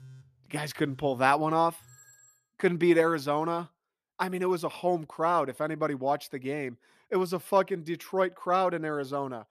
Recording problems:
alarms or sirens; faint; until 2.5 s; 25 dB below the speech

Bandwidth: 14.5 kHz